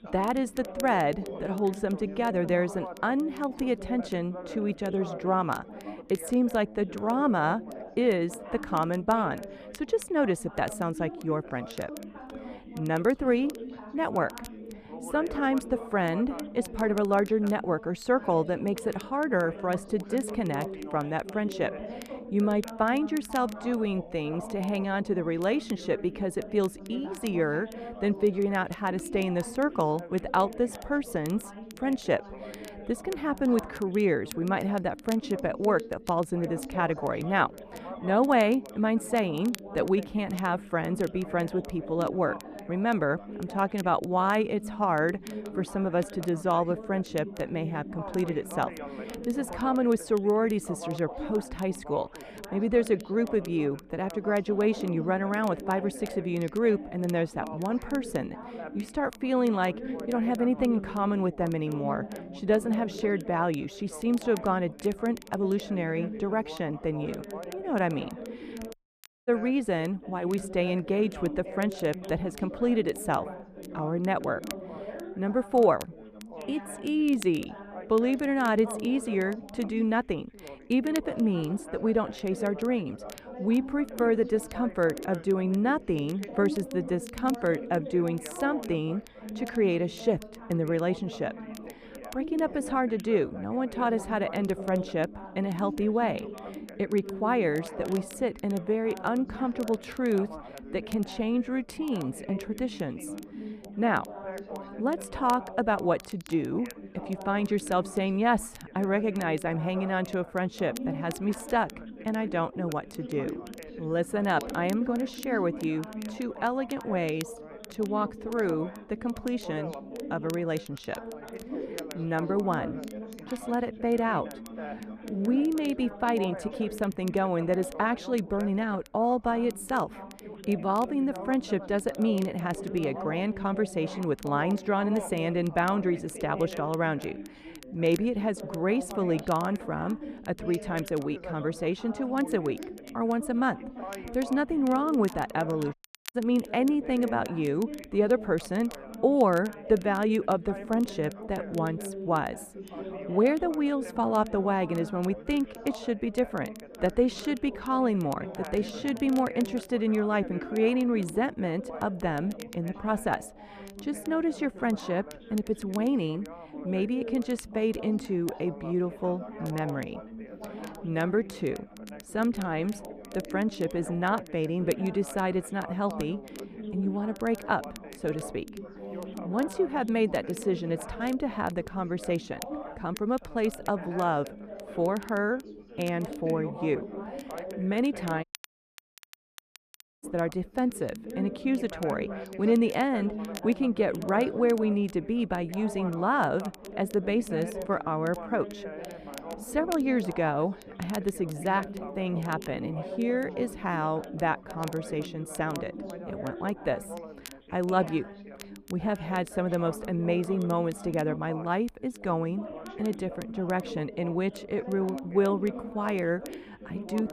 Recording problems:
muffled; slightly; fading above 3 kHz
background chatter; noticeable; throughout; 3 voices, 10 dB below the speech
crackle, like an old record; faint; 25 dB below the speech
audio cutting out; at 1:09 for 0.5 s, at 2:26 and at 3:08 for 2 s

